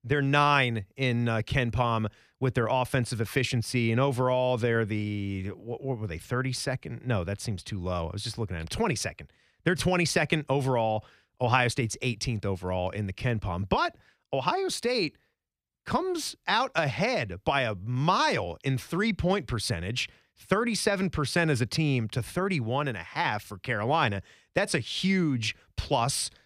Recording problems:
none

